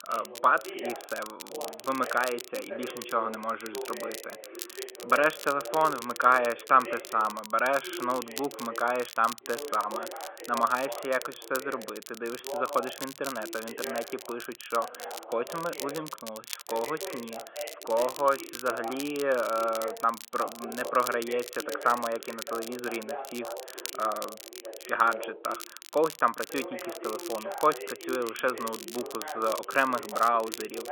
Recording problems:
phone-call audio; nothing above 3.5 kHz
voice in the background; noticeable; throughout; 10 dB below the speech
crackle, like an old record; noticeable; 10 dB below the speech

